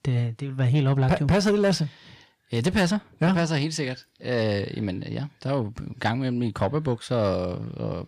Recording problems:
distortion; slight; 10 dB below the speech

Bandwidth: 15 kHz